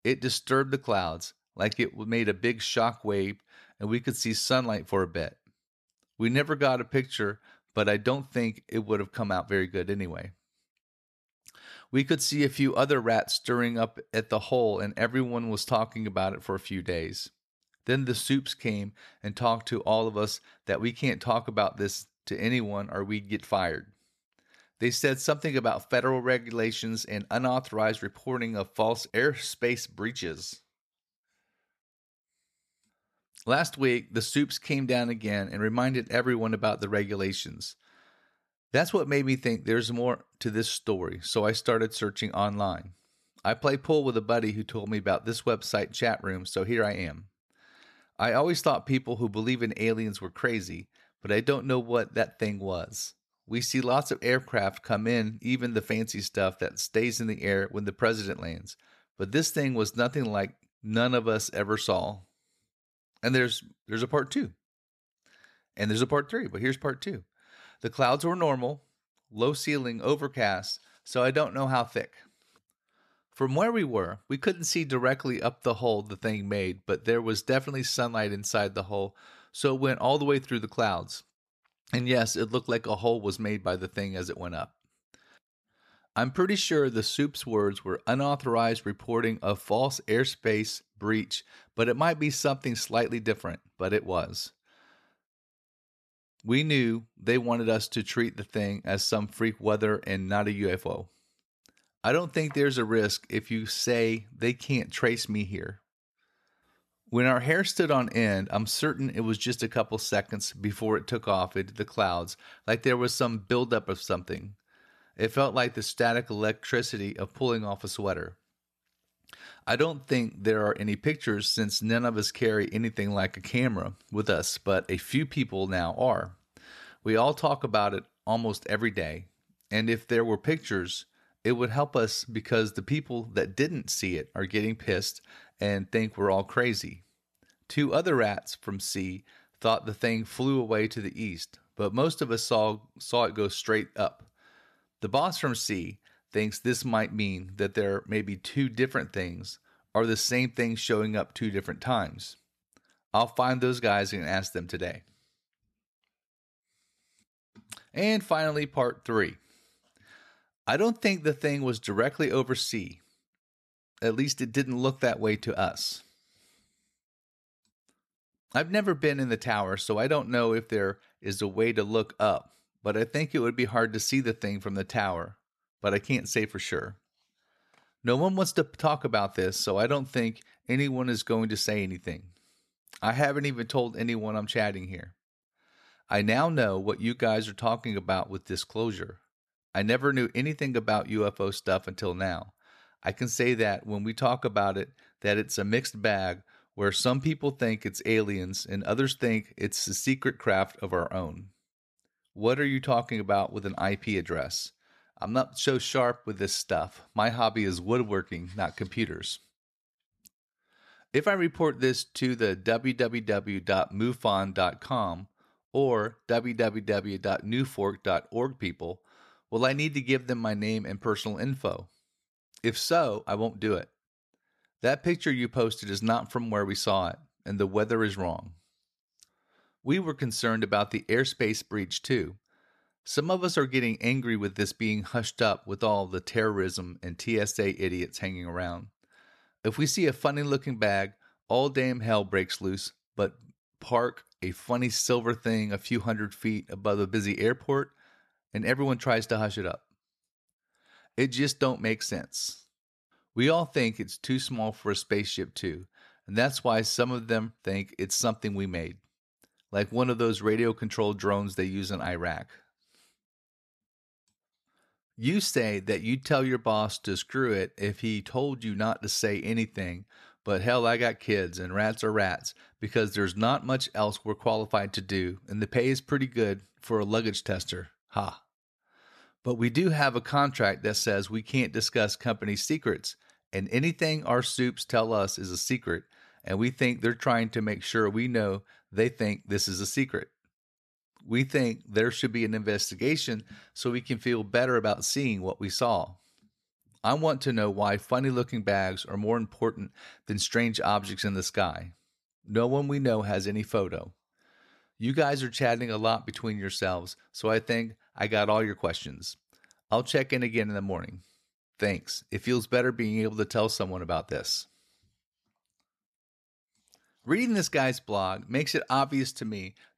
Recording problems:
none

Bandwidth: 13.5 kHz